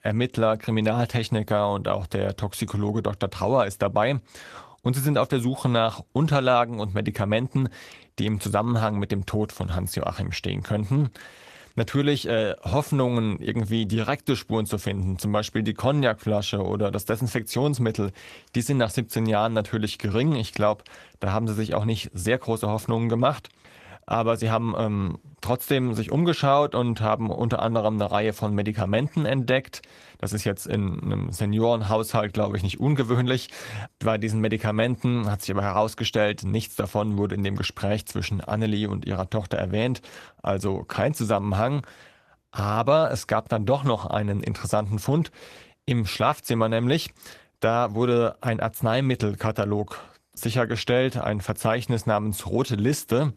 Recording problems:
garbled, watery; slightly; nothing above 14 kHz

